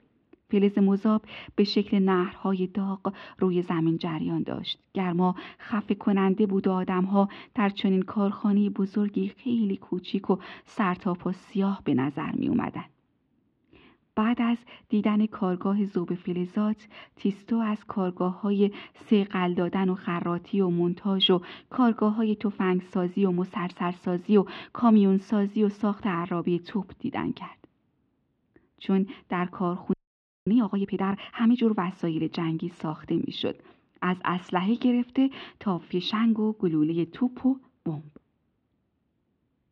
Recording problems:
muffled; slightly; fading above 3.5 kHz
audio freezing; at 30 s for 0.5 s

